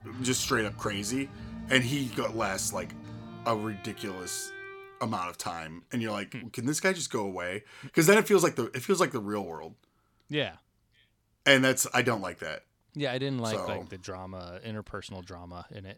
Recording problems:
background music; noticeable; until 4.5 s; 15 dB below the speech

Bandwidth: 17.5 kHz